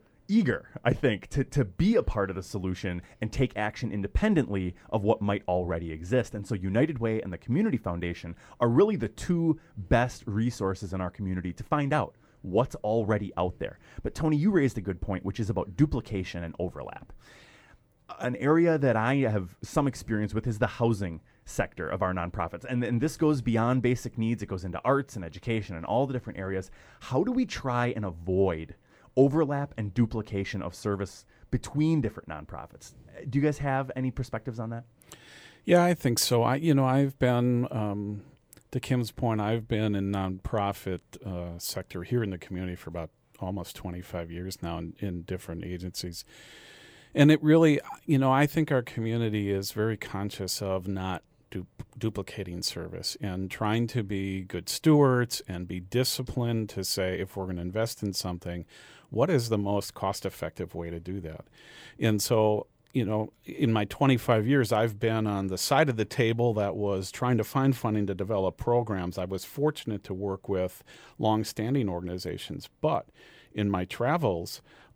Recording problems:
none

